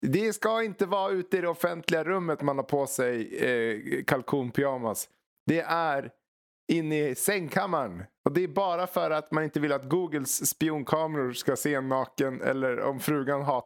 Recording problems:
squashed, flat; somewhat

